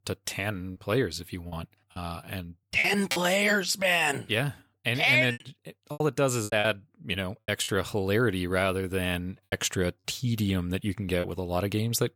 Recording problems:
choppy; very; 7% of the speech affected

